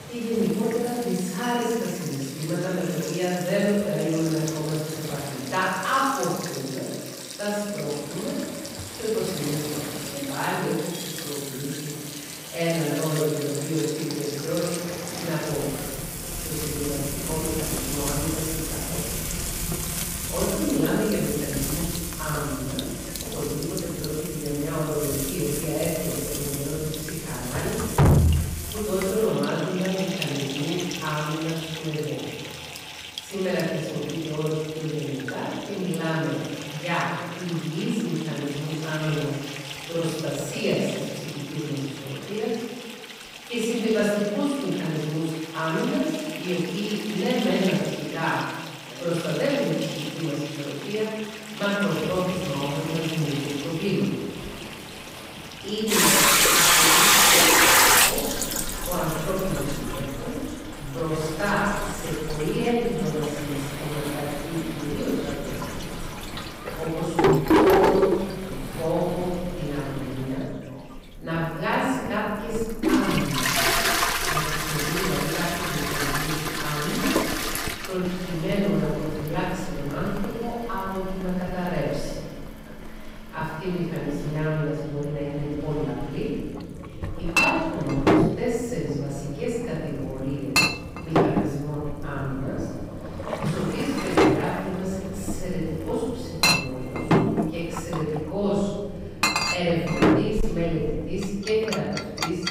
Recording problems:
distortion; heavy; 1.8% of the sound clipped
room echo; strong; dies away in 1.3 s
off-mic speech; far
household noises; very loud; throughout; 3 dB above the speech
rain or running water; loud; throughout; 10 dB below the speech
voice in the background; faint; throughout; 20 dB below the speech

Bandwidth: 15.5 kHz